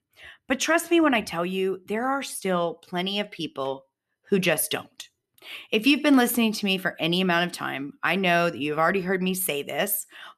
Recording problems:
none

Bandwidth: 13.5 kHz